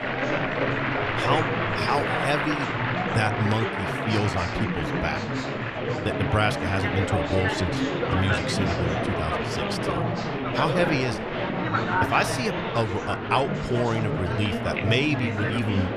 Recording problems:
chatter from many people; very loud; throughout; 1 dB above the speech

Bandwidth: 14.5 kHz